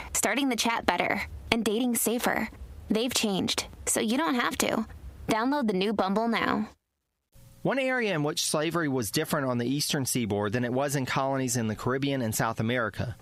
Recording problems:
squashed, flat; heavily

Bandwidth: 15.5 kHz